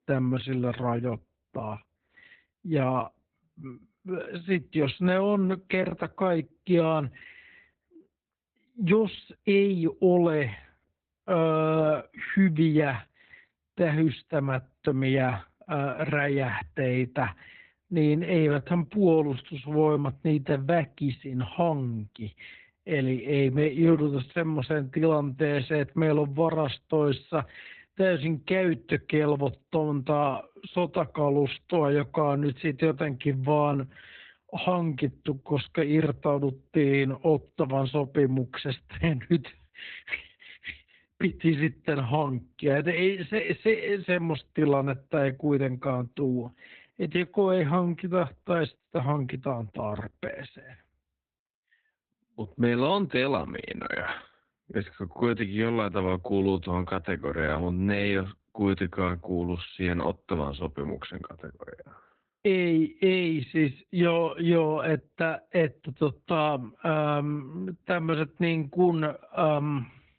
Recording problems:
garbled, watery; badly; nothing above 4 kHz
wrong speed, natural pitch; too slow; 0.6 times normal speed

